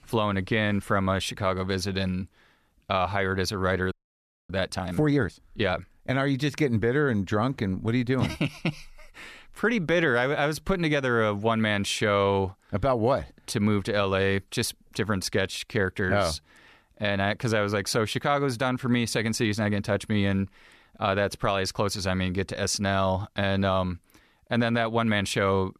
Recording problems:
audio freezing; at 4 s for 0.5 s

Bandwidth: 14 kHz